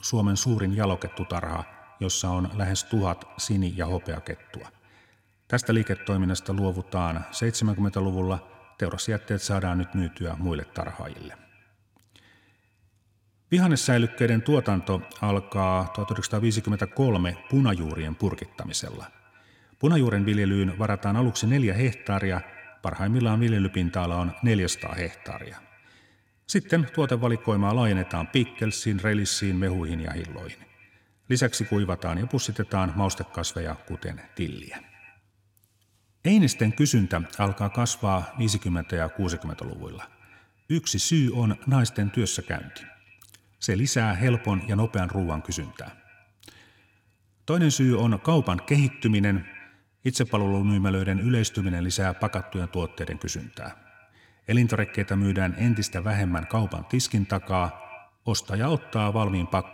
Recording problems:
echo of what is said; faint; throughout; 100 ms later, 20 dB below the speech

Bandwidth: 16.5 kHz